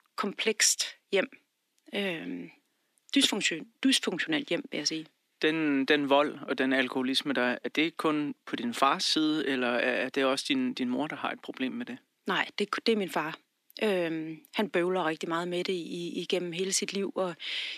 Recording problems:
thin; very slightly; fading below 250 Hz

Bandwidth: 14.5 kHz